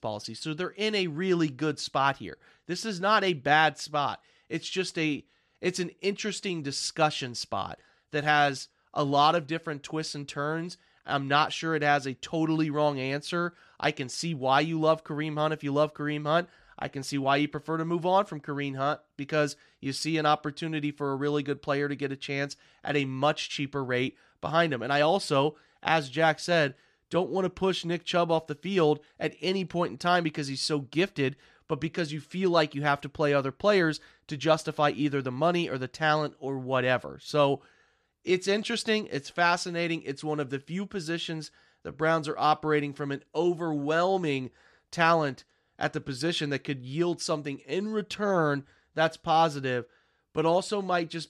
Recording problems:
none

